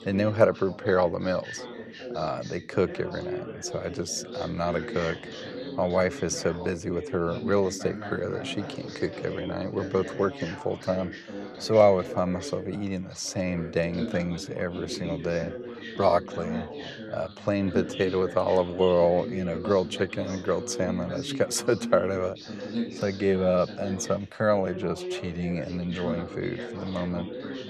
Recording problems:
background chatter; loud; throughout; 2 voices, 9 dB below the speech

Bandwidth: 15 kHz